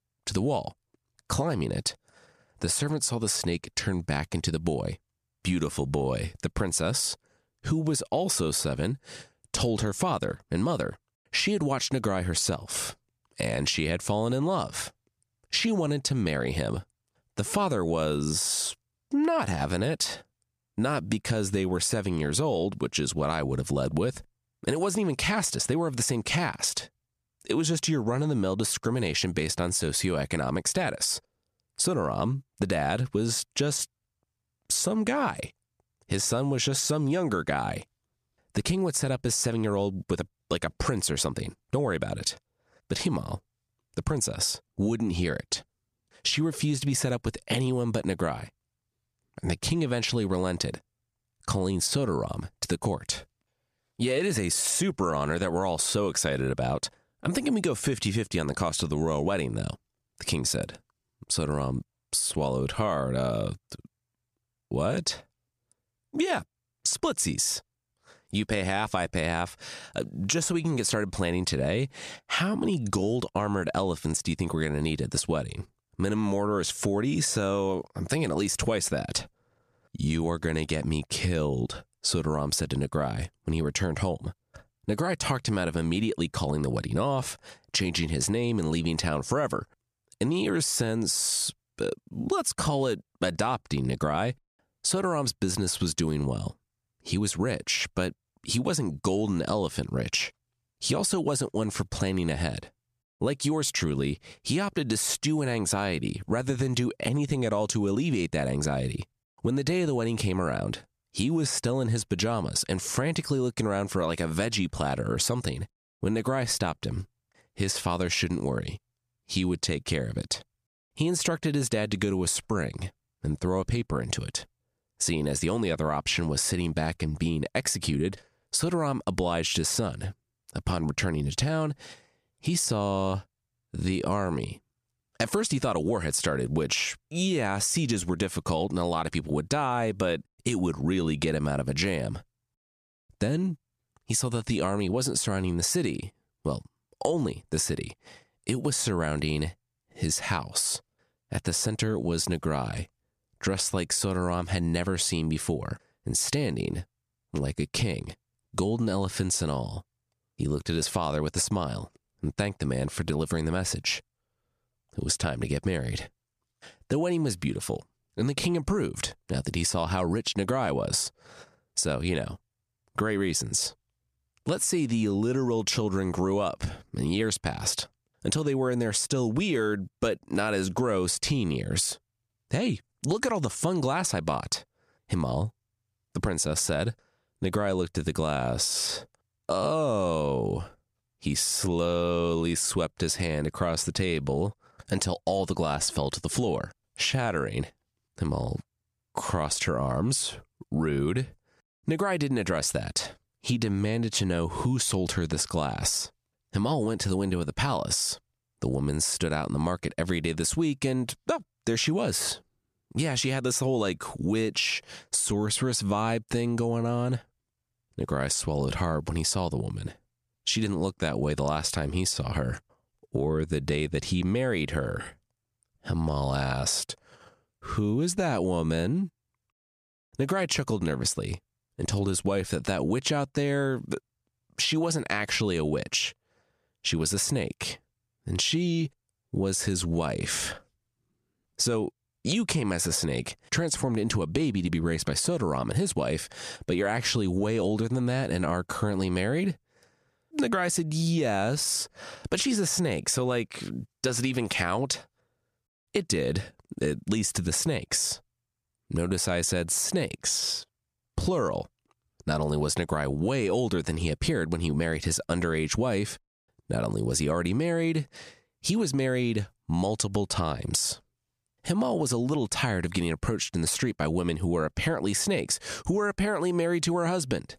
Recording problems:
squashed, flat; heavily

